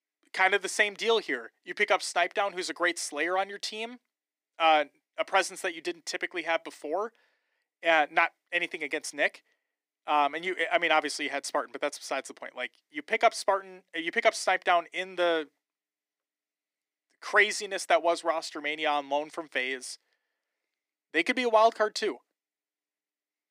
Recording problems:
thin; very; fading below 300 Hz

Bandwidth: 15.5 kHz